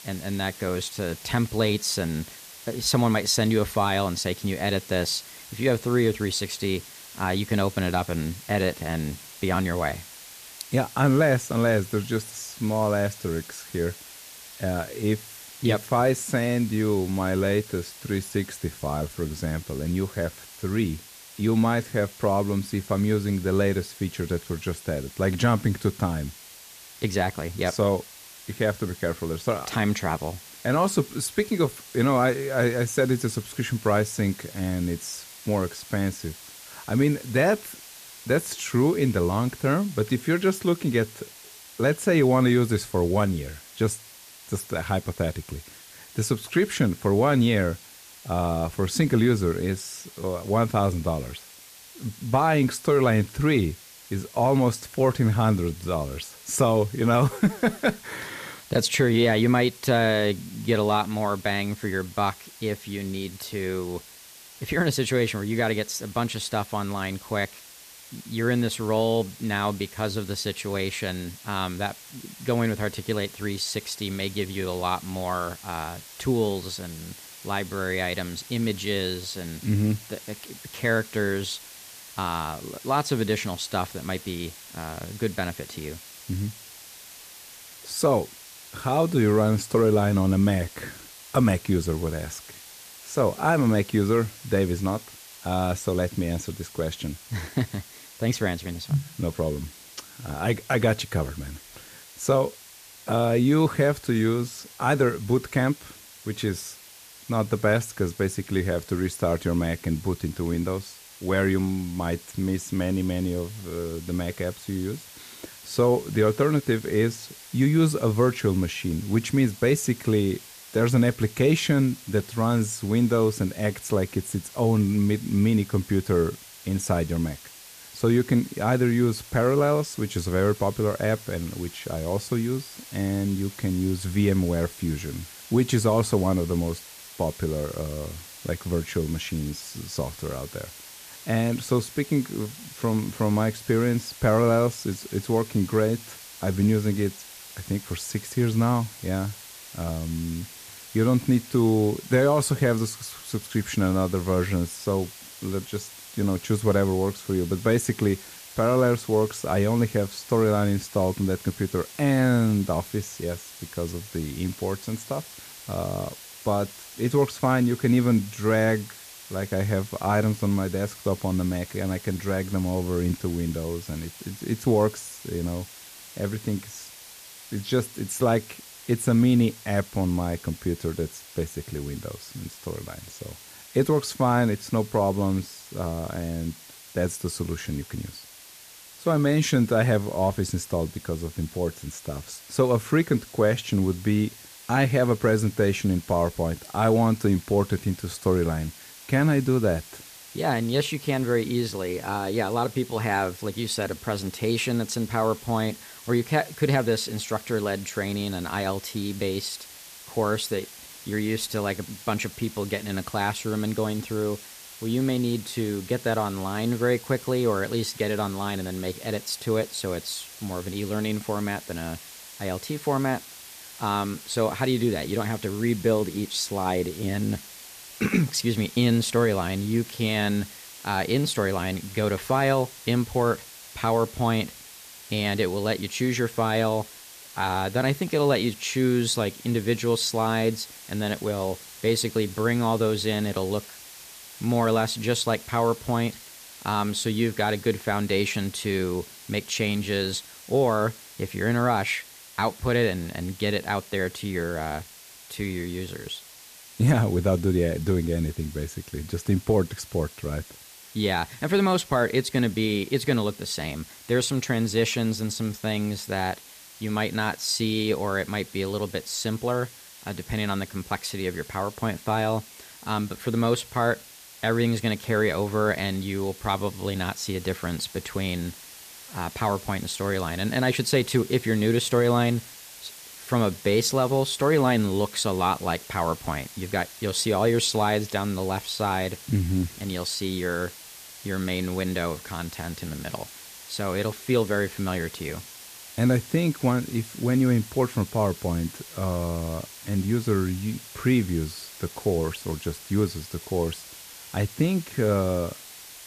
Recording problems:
hiss; noticeable; throughout; 15 dB below the speech

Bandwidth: 14.5 kHz